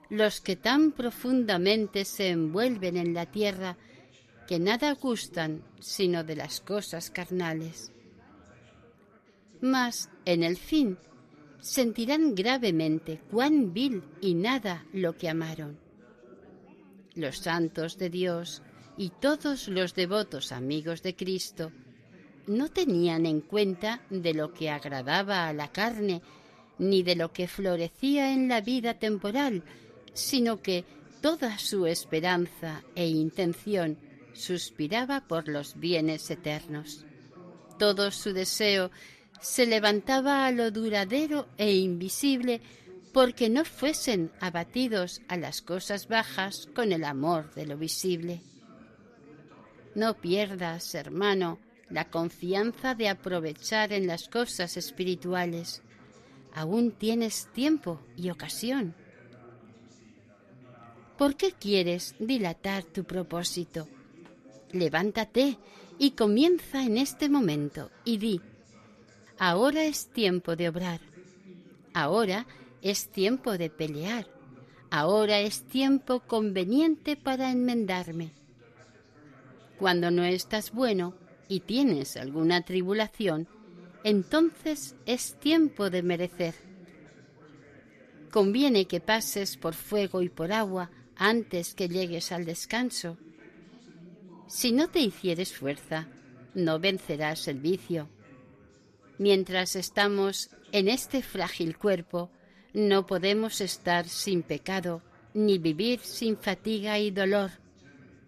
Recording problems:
background chatter; faint; throughout; 3 voices, 25 dB below the speech

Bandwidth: 14.5 kHz